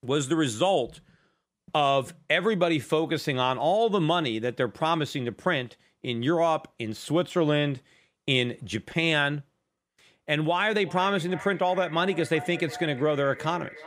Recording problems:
echo of what is said; noticeable; from 11 s on; 360 ms later, 15 dB below the speech

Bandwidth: 15.5 kHz